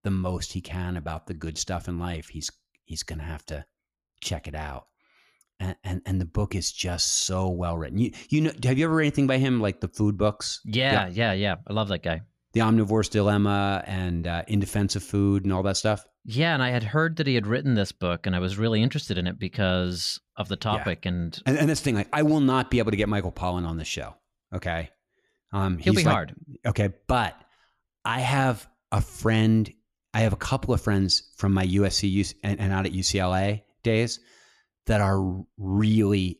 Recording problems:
none

